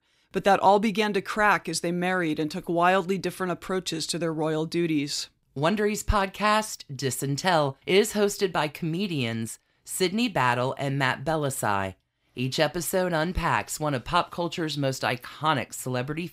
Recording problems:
none

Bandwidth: 15.5 kHz